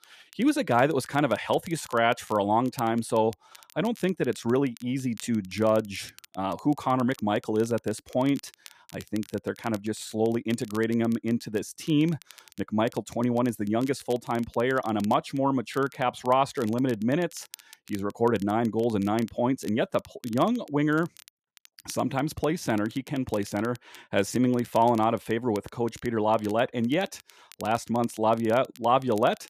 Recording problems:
crackle, like an old record; faint; 25 dB below the speech

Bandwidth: 14.5 kHz